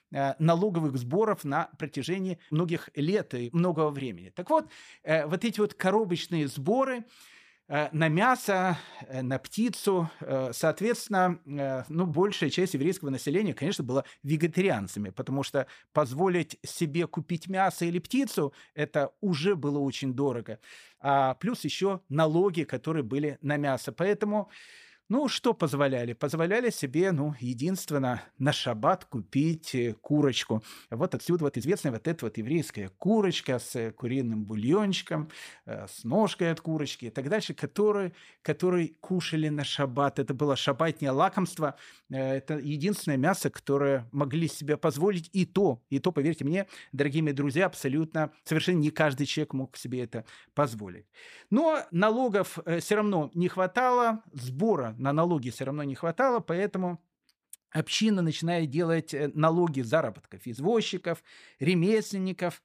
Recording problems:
uneven, jittery; strongly; from 2.5 to 57 s

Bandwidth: 15 kHz